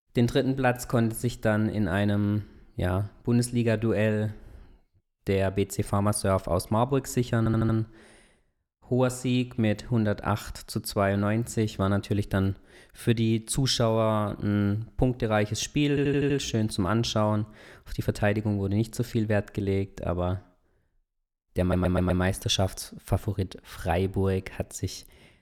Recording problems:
audio stuttering; at 7.5 s, at 16 s and at 22 s

